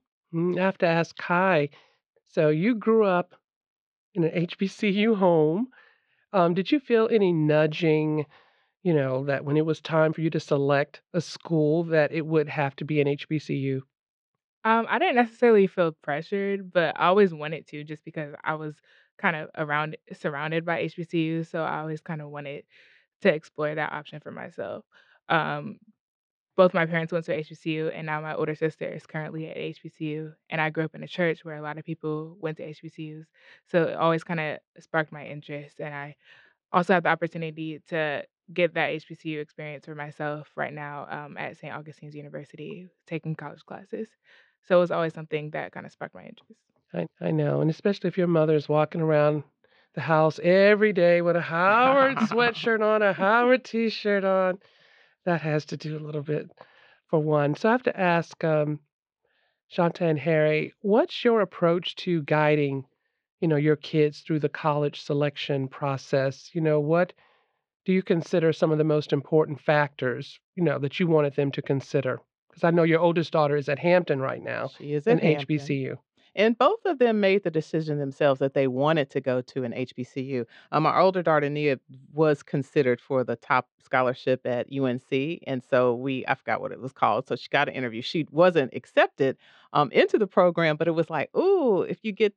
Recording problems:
muffled; slightly; fading above 4 kHz

